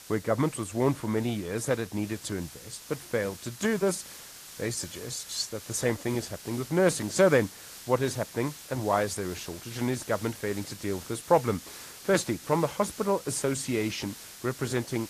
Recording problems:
garbled, watery; slightly
hiss; noticeable; throughout; 15 dB below the speech

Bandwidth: 14.5 kHz